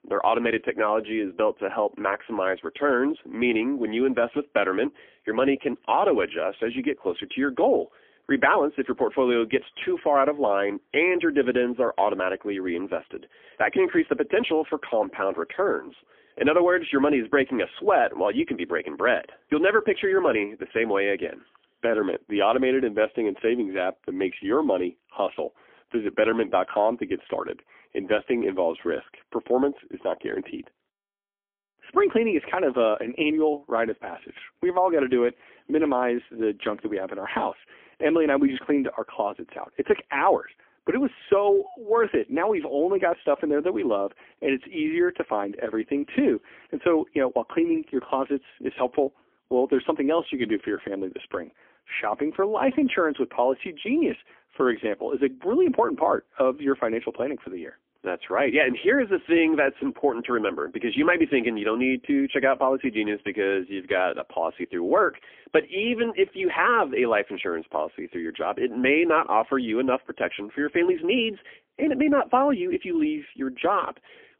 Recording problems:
phone-call audio; poor line; nothing above 3.5 kHz

